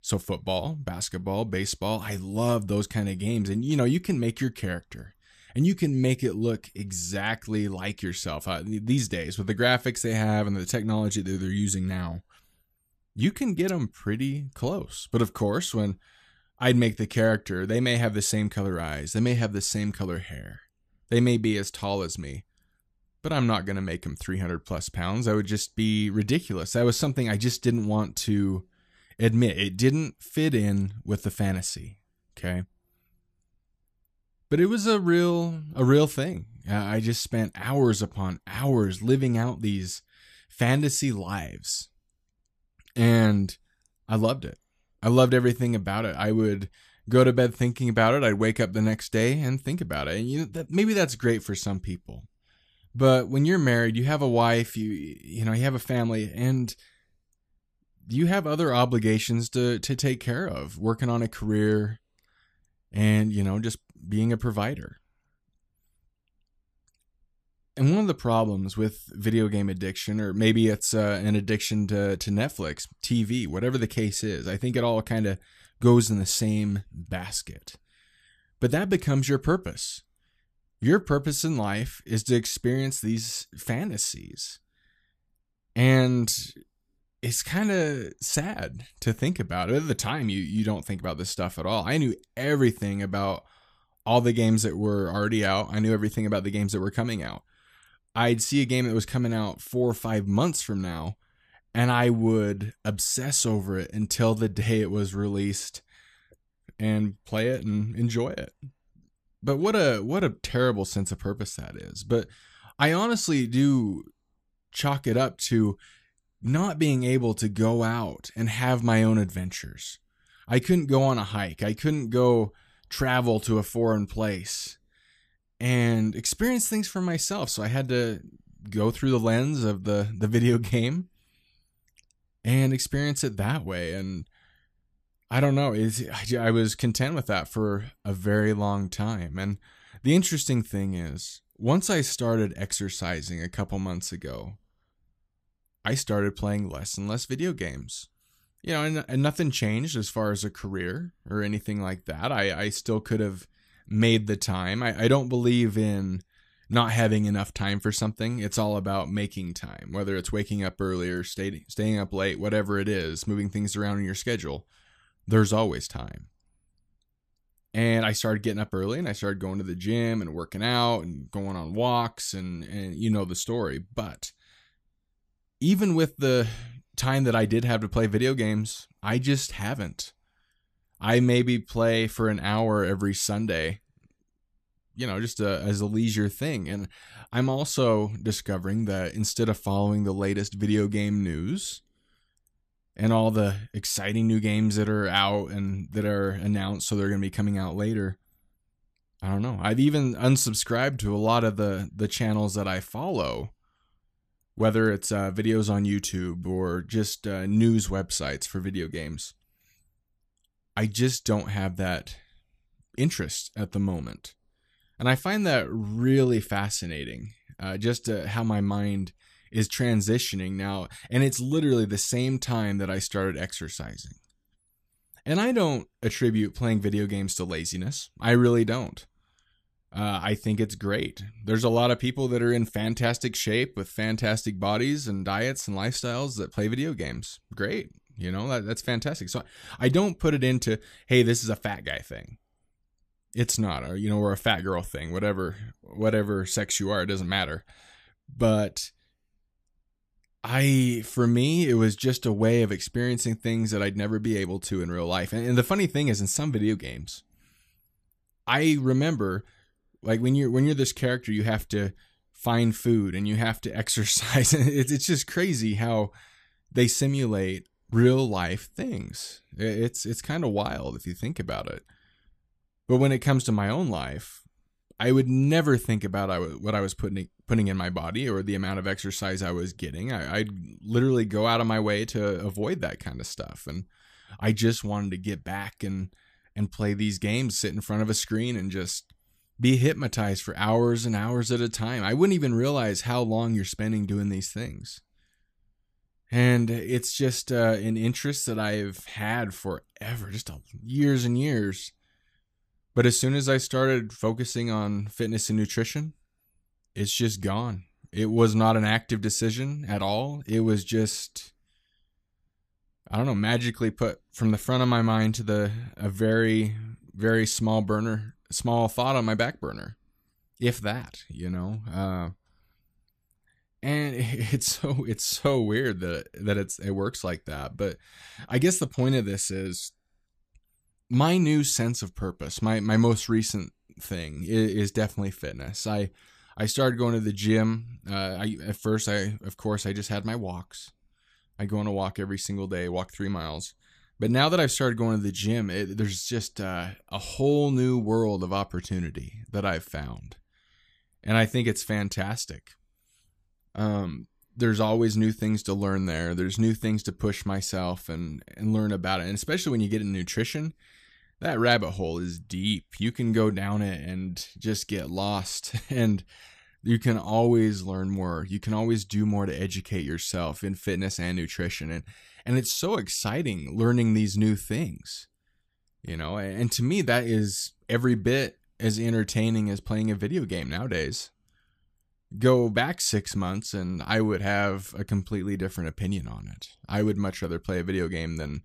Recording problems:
none

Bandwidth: 14.5 kHz